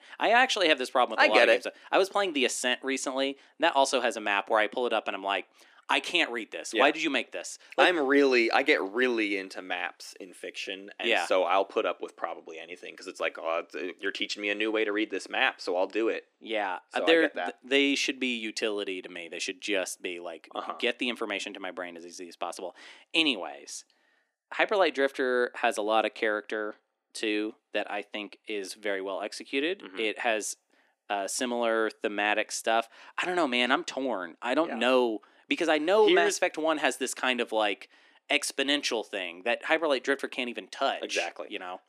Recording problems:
thin; somewhat; fading below 300 Hz

